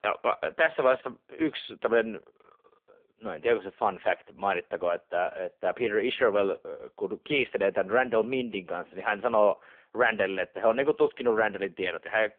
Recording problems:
phone-call audio; poor line; nothing above 3.5 kHz

